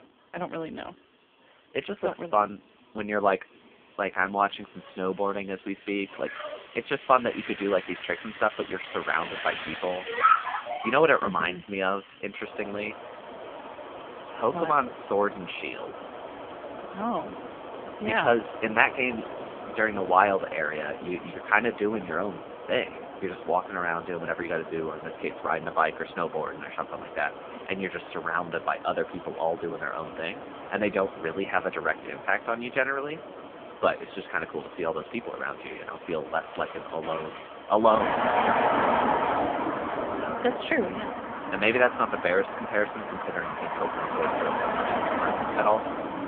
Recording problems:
phone-call audio; poor line
traffic noise; loud; throughout; 5 dB below the speech

